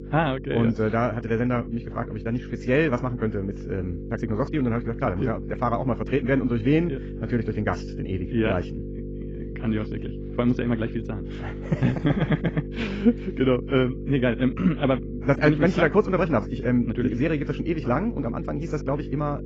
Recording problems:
garbled, watery; badly
muffled; very; fading above 2.5 kHz
wrong speed, natural pitch; too fast; 1.5 times normal speed
electrical hum; noticeable; throughout; 50 Hz, 15 dB below the speech

